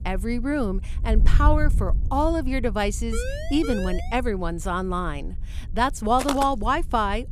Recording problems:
wind noise on the microphone; occasional gusts; 20 dB below the speech
siren; noticeable; from 3 to 4 s; peak 7 dB below the speech
footsteps; noticeable; at 6 s; peak 4 dB below the speech

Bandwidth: 14.5 kHz